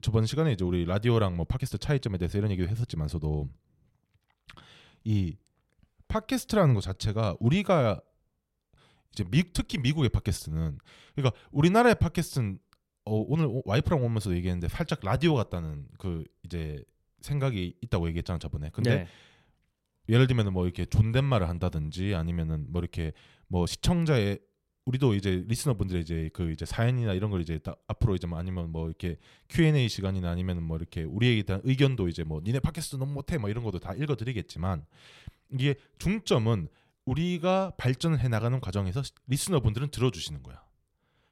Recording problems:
uneven, jittery; slightly; from 1.5 to 24 s

